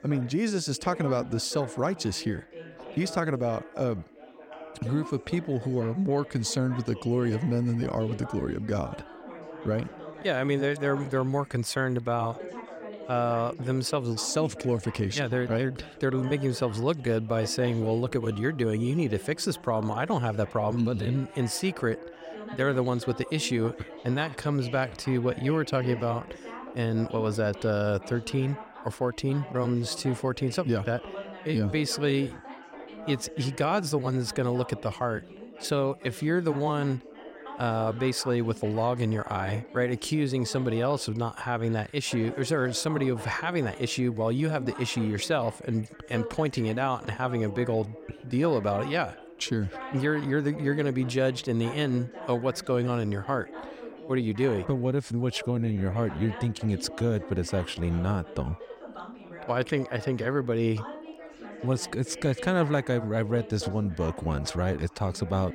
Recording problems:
background chatter; noticeable; throughout; 4 voices, 15 dB below the speech

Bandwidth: 16 kHz